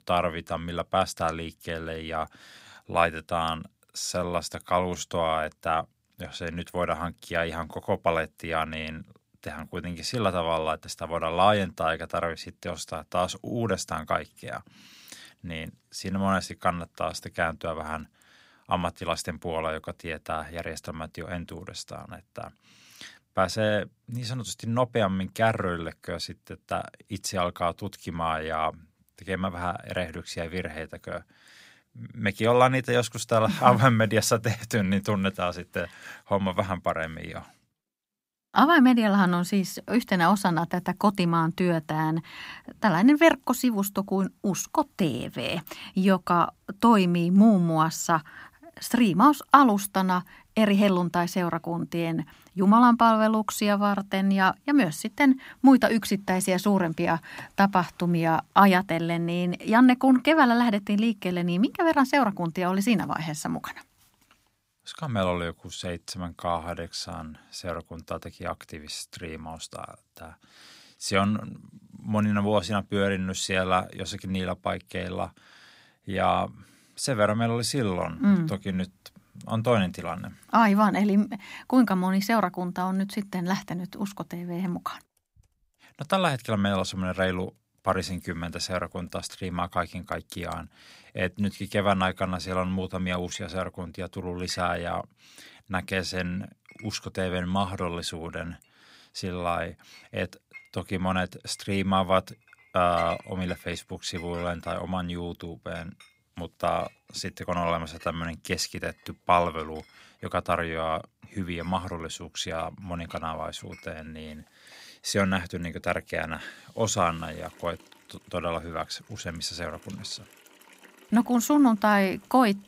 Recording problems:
household noises; faint; throughout; 25 dB below the speech

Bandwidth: 15.5 kHz